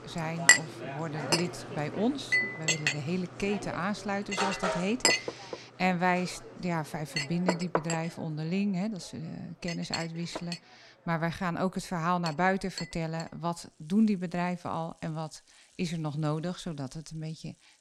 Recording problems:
household noises; very loud; throughout; 3 dB above the speech

